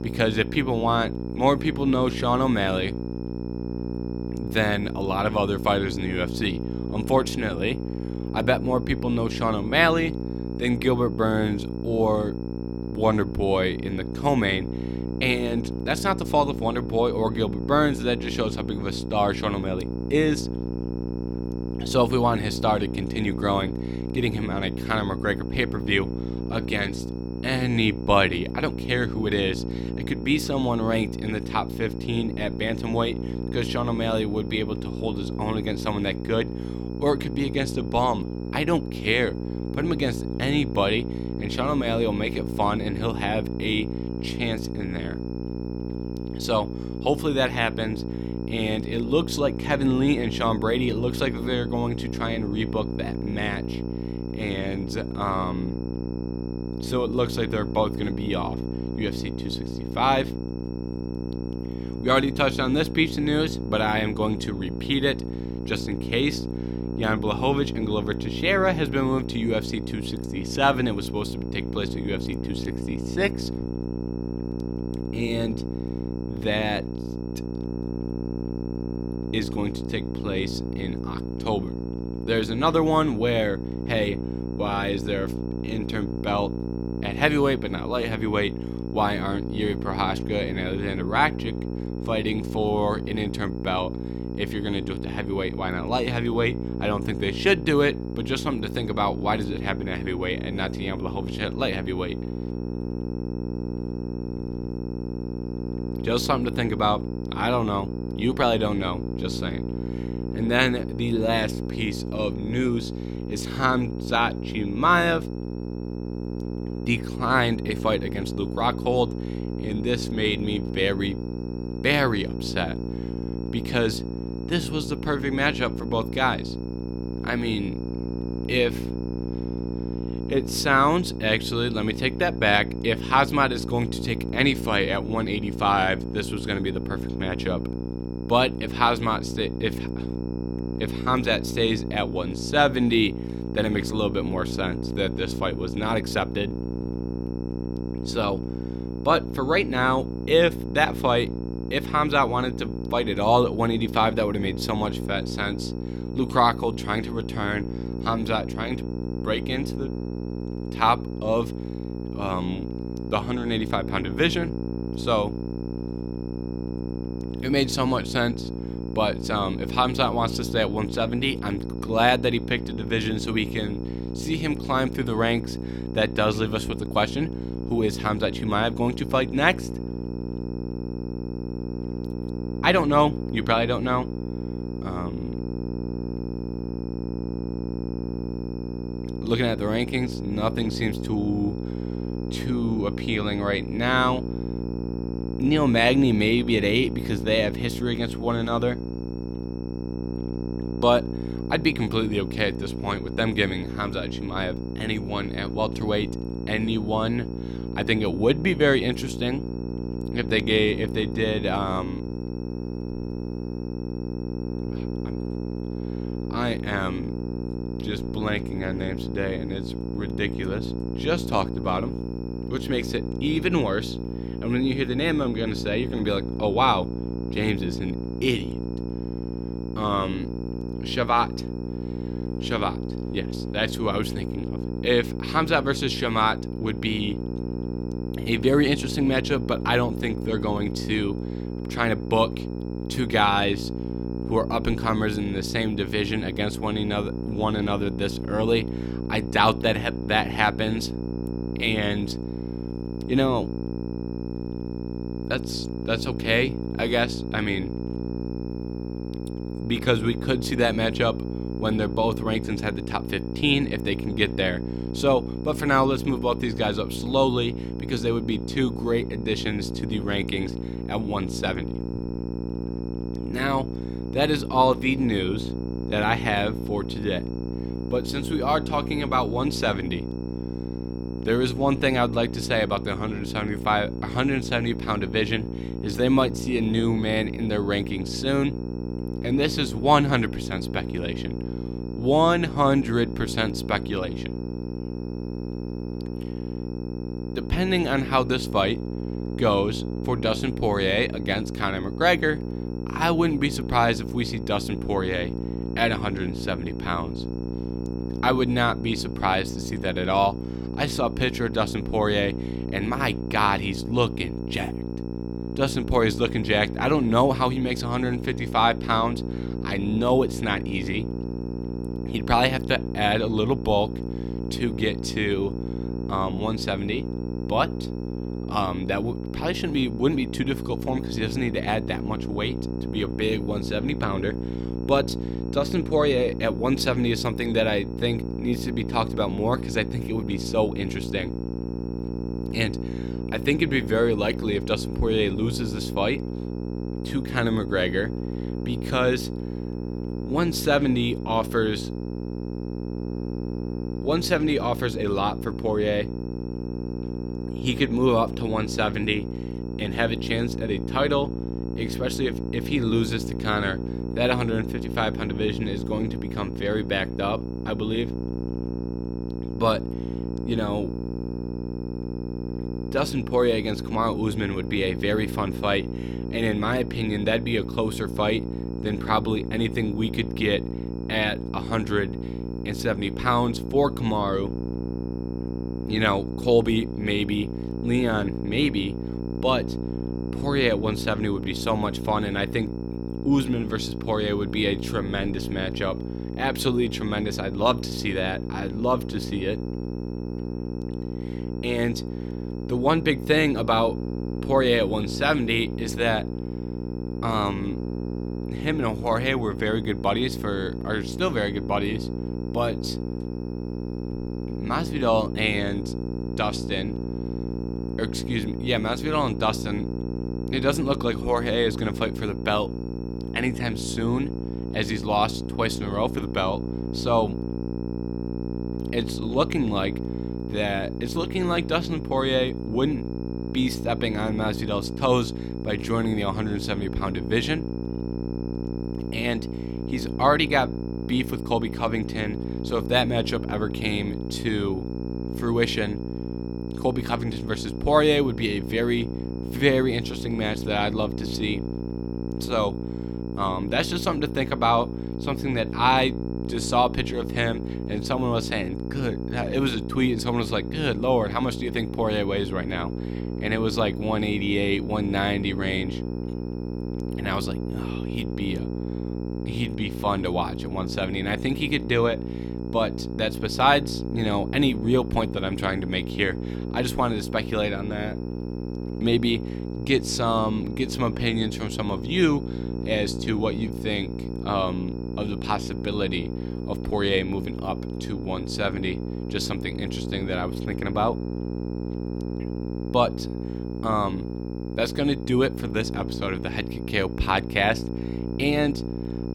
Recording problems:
electrical hum; noticeable; throughout; 60 Hz, 10 dB below the speech
high-pitched whine; faint; throughout; 5.5 kHz, 35 dB below the speech

